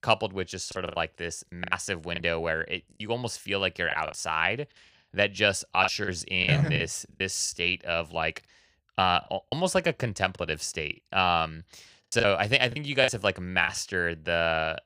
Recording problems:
choppy; very; 8% of the speech affected

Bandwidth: 15 kHz